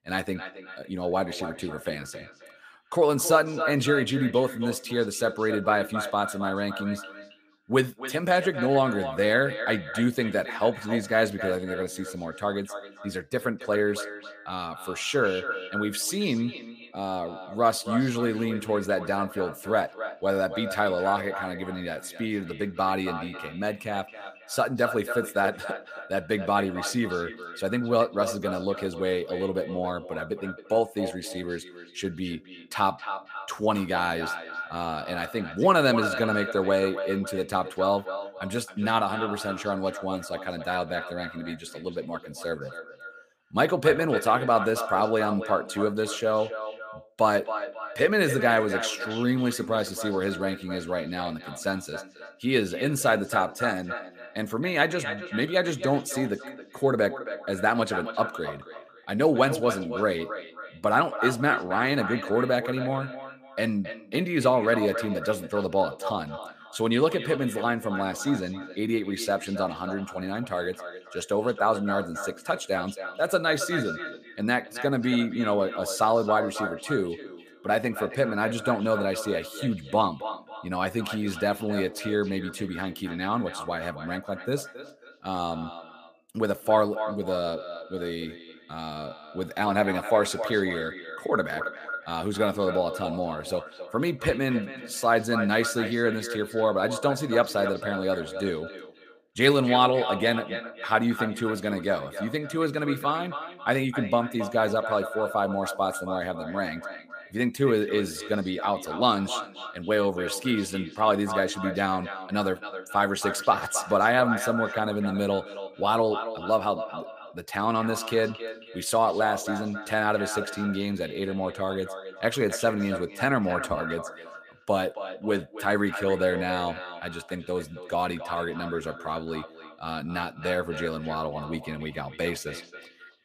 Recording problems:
echo of what is said; strong; throughout; 270 ms later, 9 dB below the speech

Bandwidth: 15 kHz